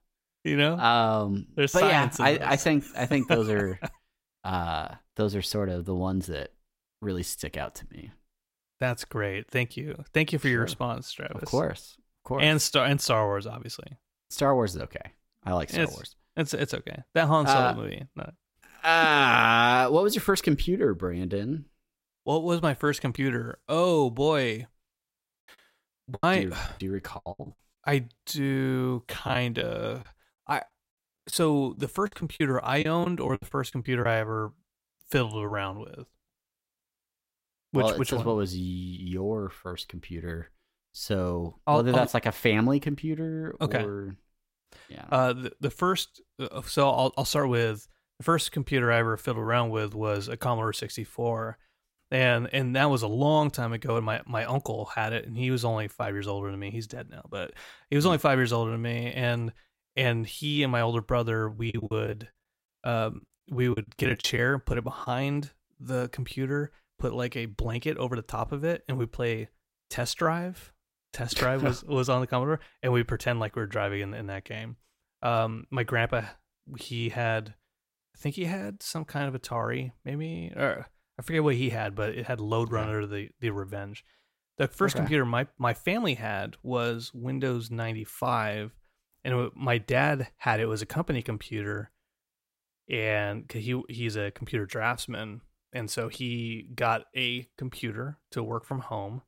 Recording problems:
choppy; very; from 26 to 28 s, from 29 to 34 s and from 1:02 to 1:05; 14% of the speech affected

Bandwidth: 16 kHz